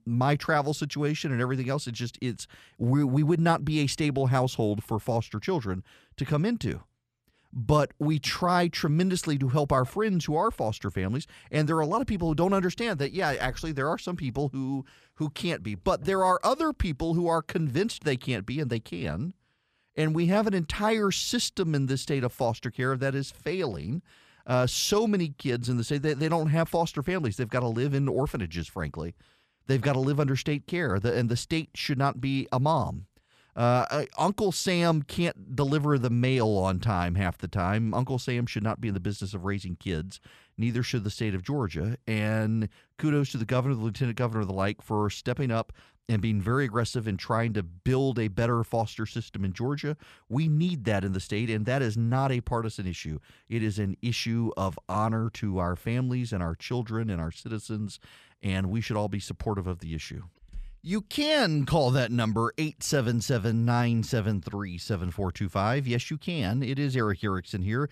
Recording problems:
none

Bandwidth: 14.5 kHz